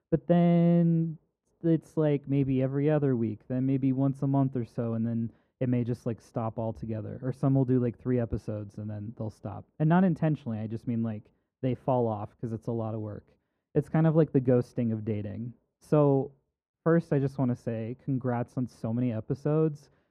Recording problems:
muffled; very; fading above 2 kHz

